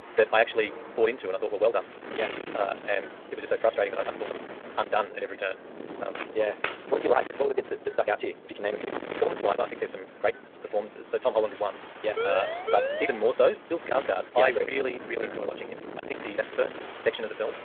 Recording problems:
distortion; heavy; 8 dB below the speech
wrong speed, natural pitch; too fast; 1.8 times normal speed
phone-call audio
rain or running water; noticeable; throughout; 20 dB below the speech
wind noise on the microphone; occasional gusts; 10 dB below the speech
door banging; noticeable; from 2 to 4.5 s; peak 9 dB below the speech
footsteps; noticeable; at 6 s; peak 6 dB below the speech
siren; noticeable; from 12 to 13 s; peak 1 dB below the speech

